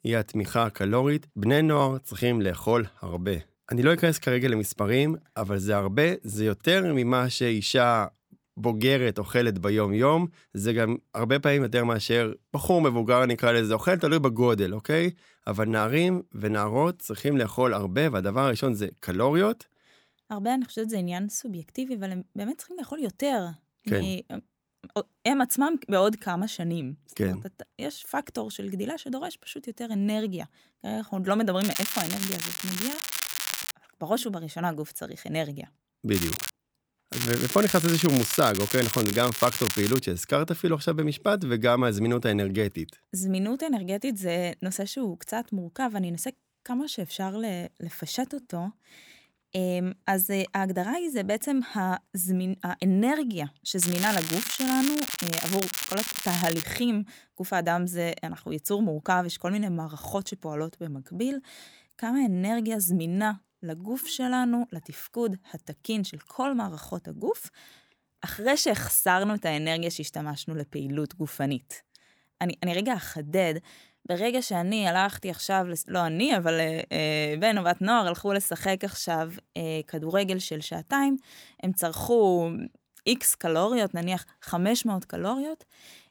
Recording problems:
crackling; loud; 4 times, first at 32 s; 3 dB below the speech

